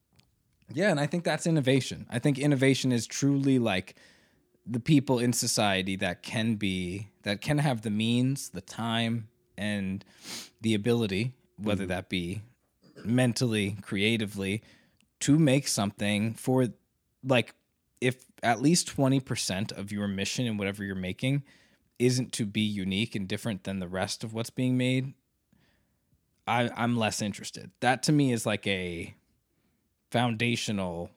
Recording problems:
none

